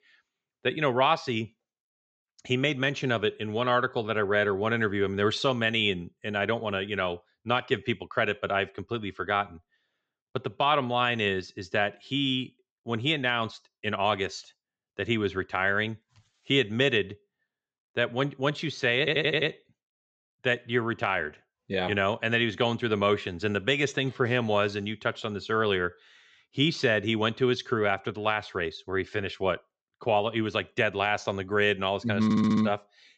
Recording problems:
high frequencies cut off; noticeable; nothing above 8 kHz
audio stuttering; at 19 s and at 32 s

